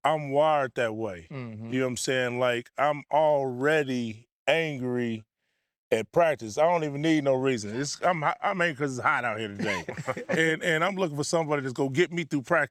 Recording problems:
none

